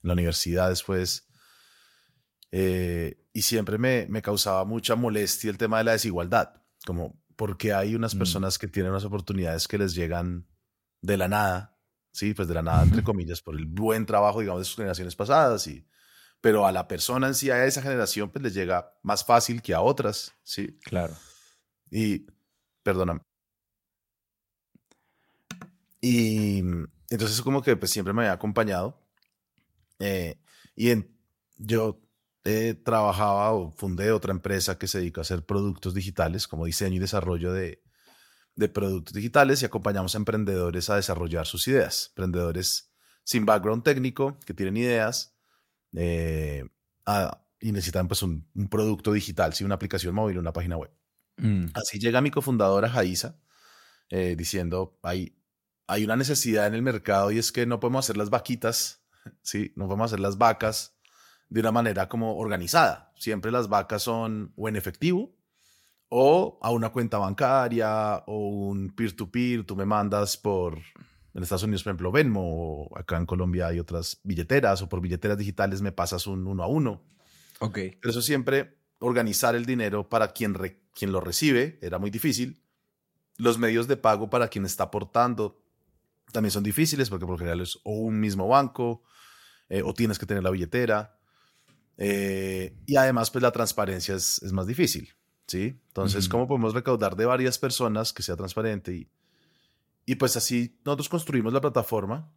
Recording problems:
none

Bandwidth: 16.5 kHz